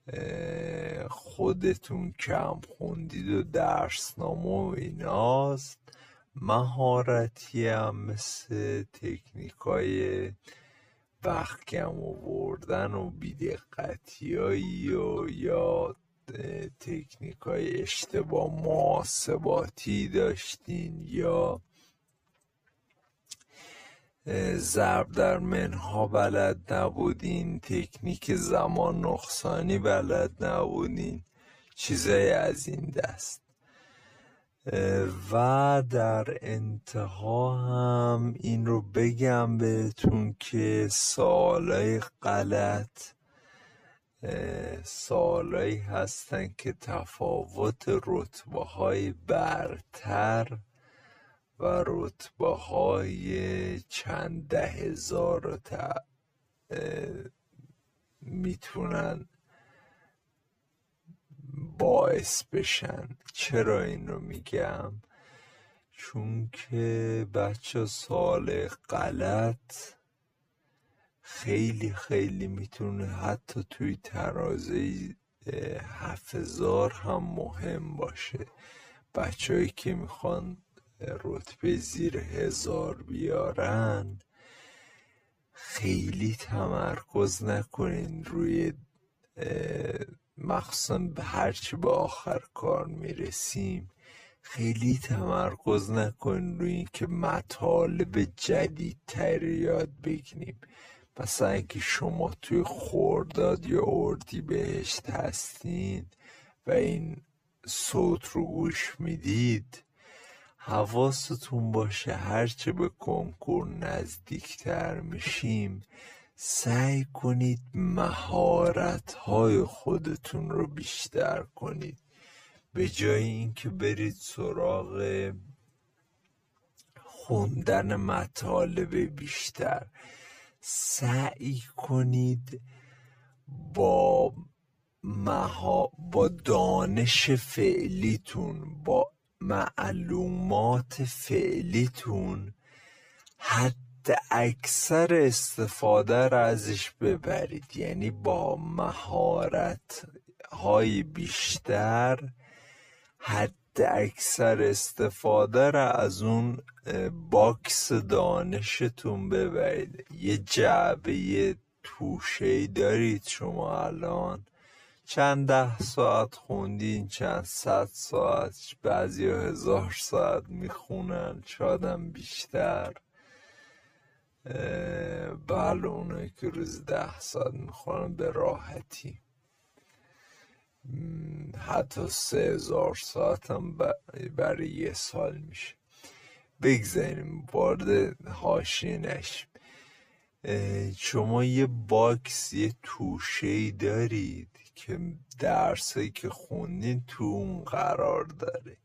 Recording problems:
wrong speed, natural pitch; too slow; 0.5 times normal speed

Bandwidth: 14.5 kHz